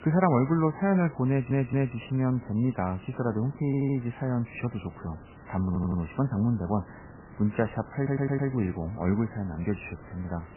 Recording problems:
garbled, watery; badly; nothing above 3 kHz
hiss; faint; throughout; 20 dB below the speech
audio stuttering; 4 times, first at 1.5 s

